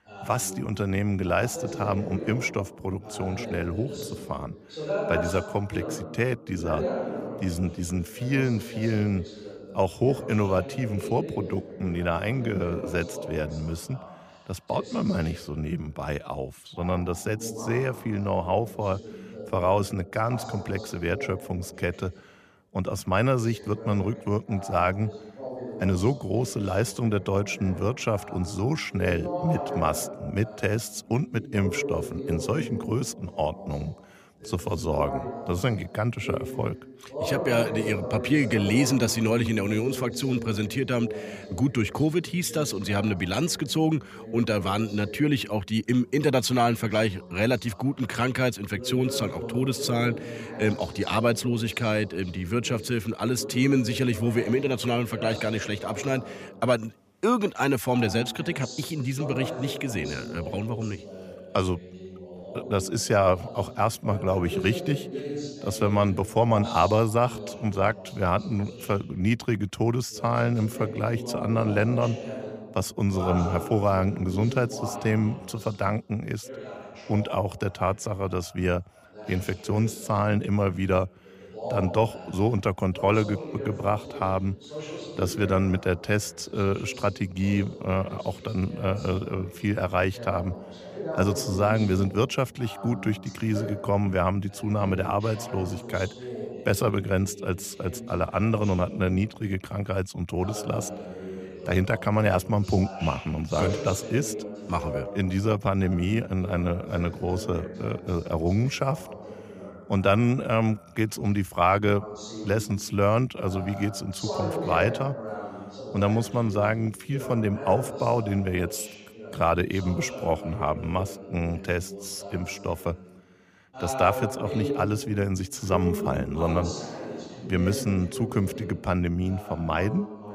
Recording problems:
voice in the background; noticeable; throughout; 10 dB below the speech

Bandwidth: 15 kHz